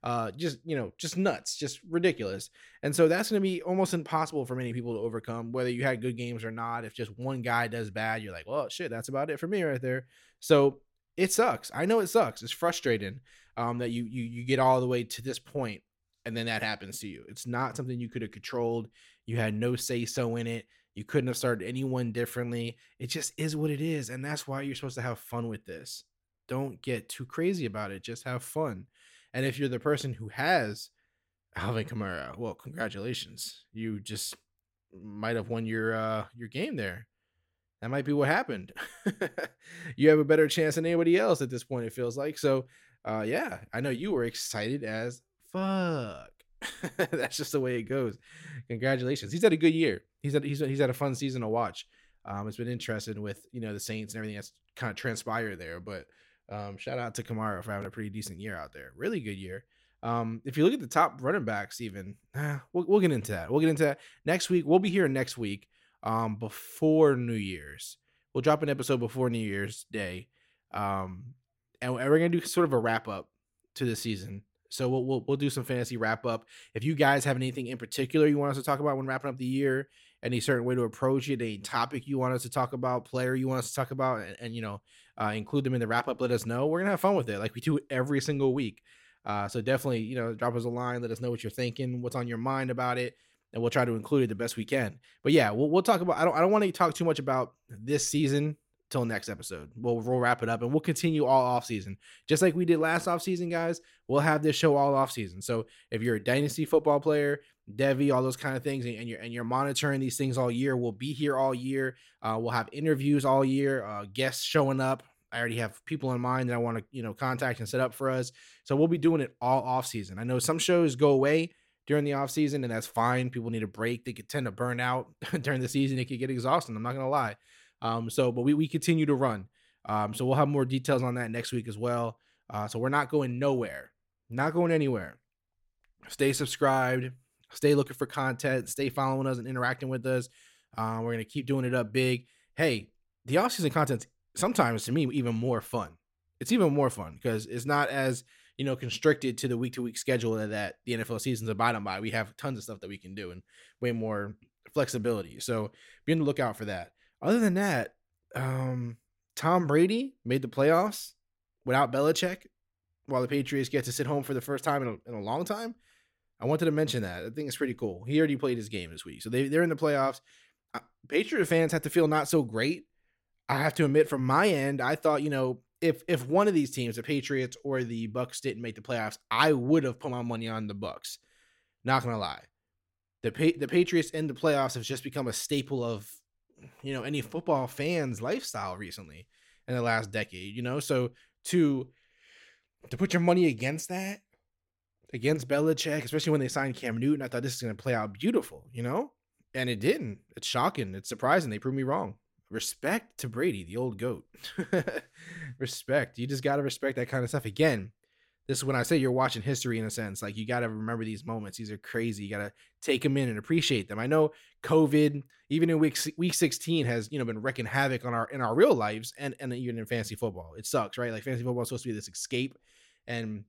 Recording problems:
none

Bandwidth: 16.5 kHz